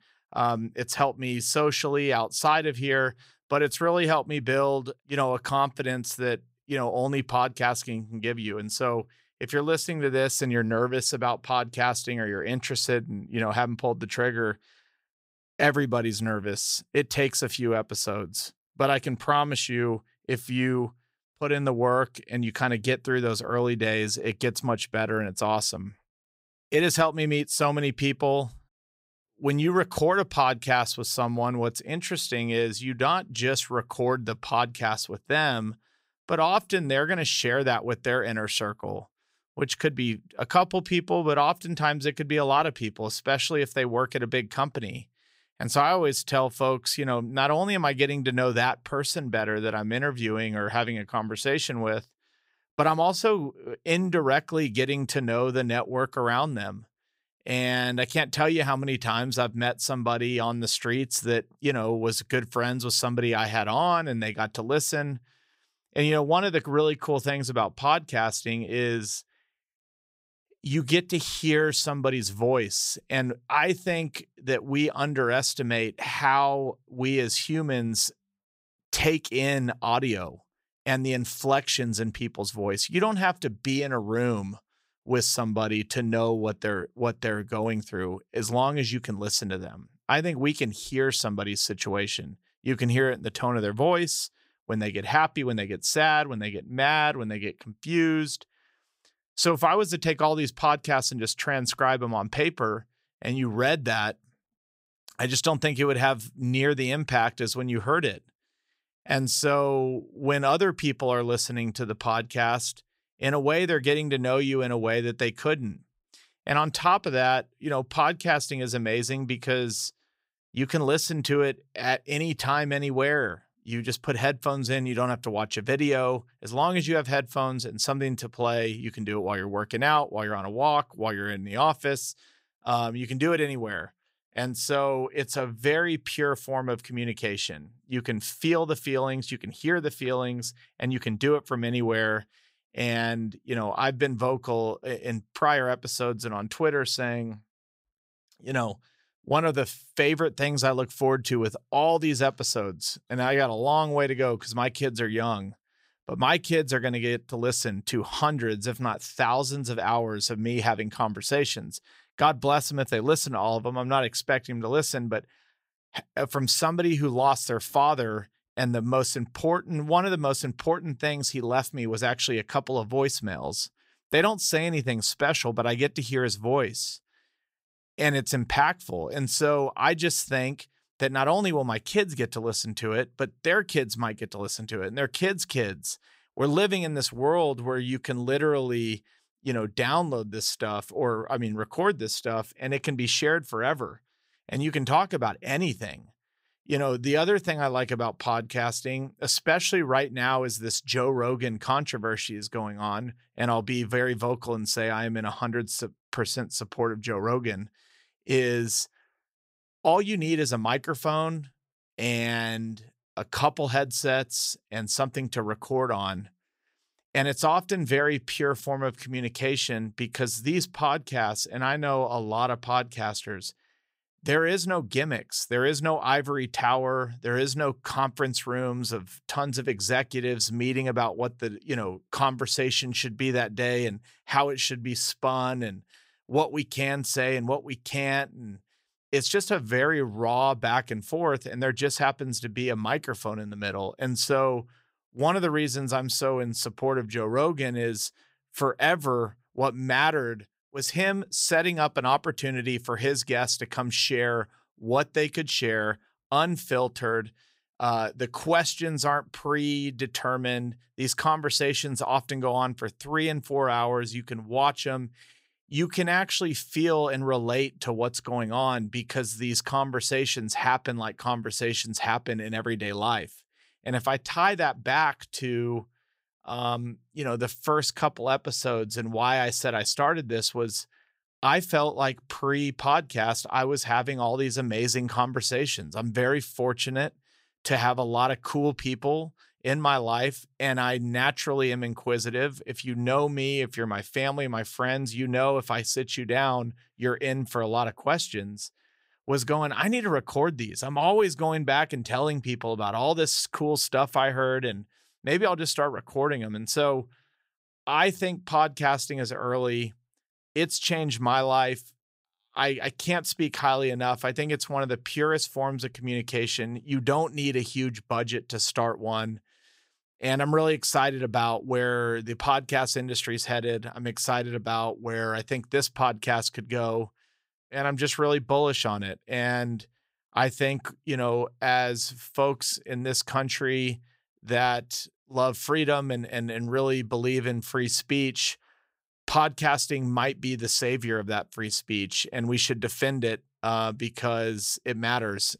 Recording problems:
none

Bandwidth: 15.5 kHz